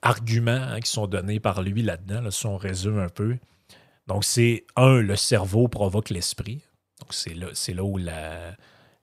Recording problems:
none

